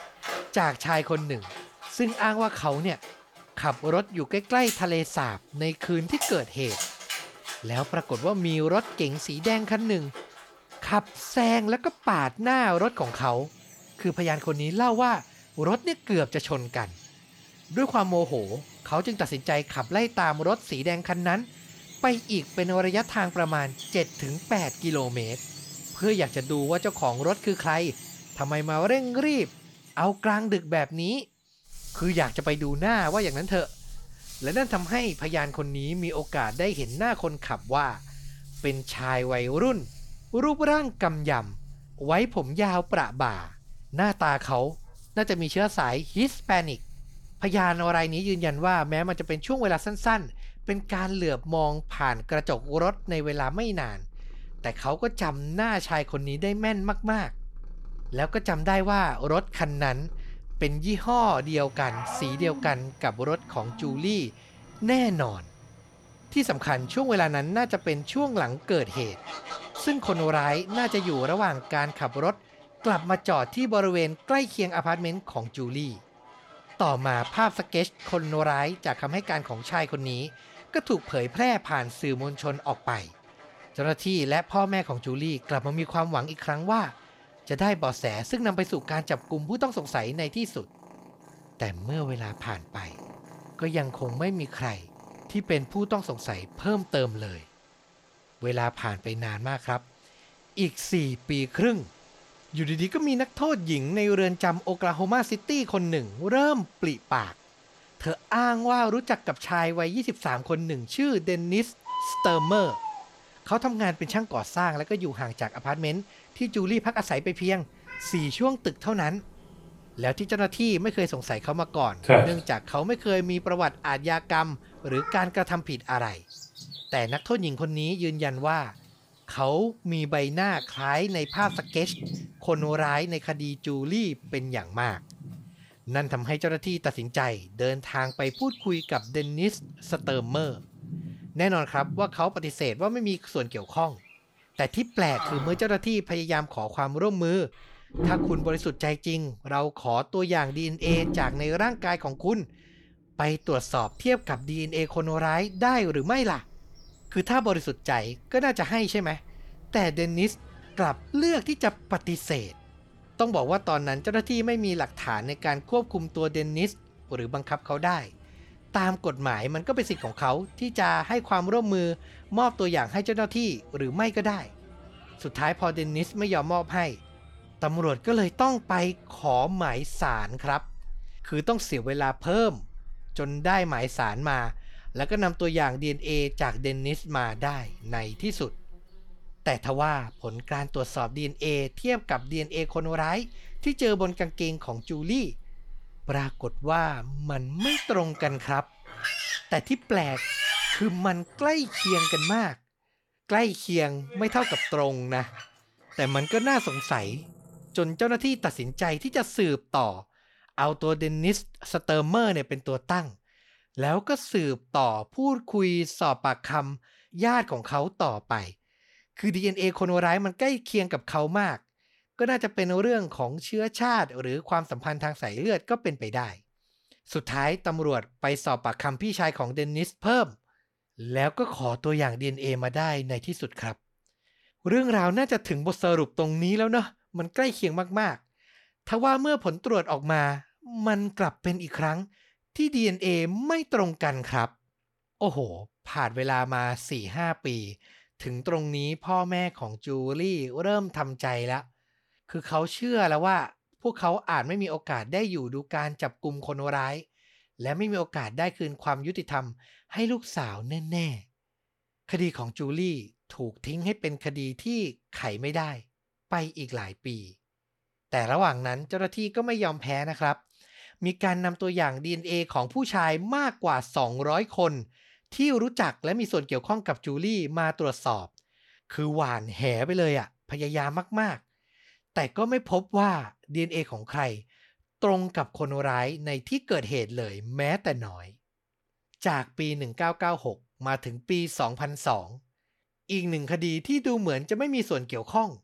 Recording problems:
animal sounds; loud; until 3:29; 10 dB below the speech

